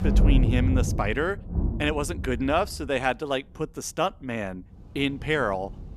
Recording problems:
rain or running water; very loud; throughout; 1 dB above the speech

